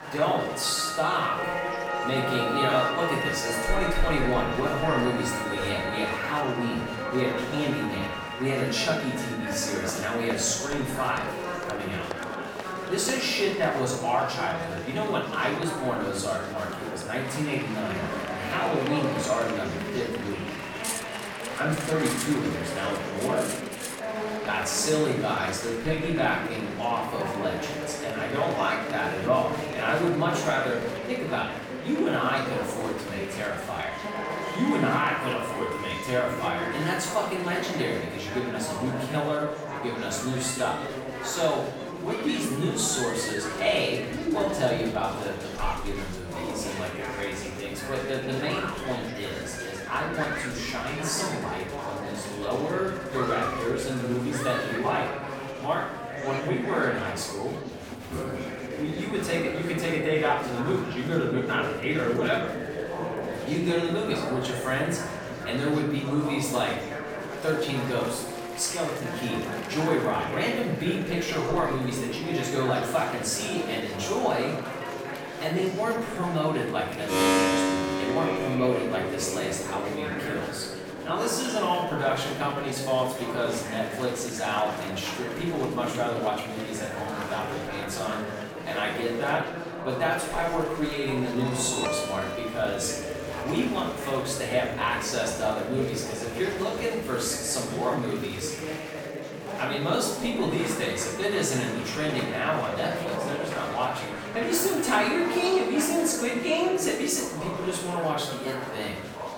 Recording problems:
off-mic speech; far
room echo; noticeable; dies away in 0.7 s
background music; loud; throughout; 8 dB below the speech
murmuring crowd; loud; throughout; 6 dB below the speech
clattering dishes; noticeable; from 21 to 24 s; peak 3 dB below the speech

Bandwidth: 17.5 kHz